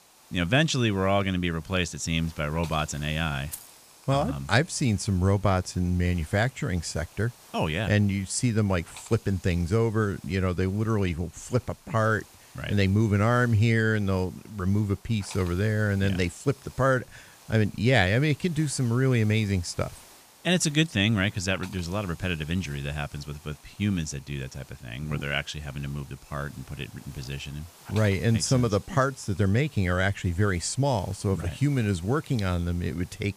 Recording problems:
hiss; faint; throughout; 25 dB below the speech
jangling keys; faint; at 3.5 s; peak 15 dB below the speech

